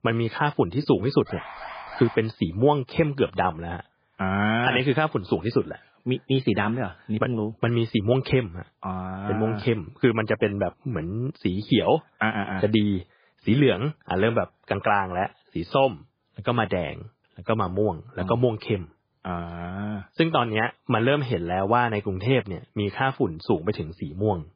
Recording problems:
garbled, watery; badly
alarm; faint; at 1.5 s; peak 10 dB below the speech

